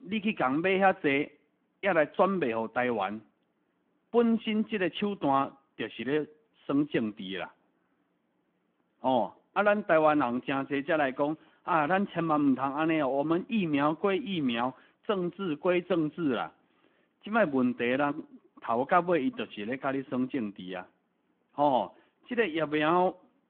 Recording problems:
phone-call audio

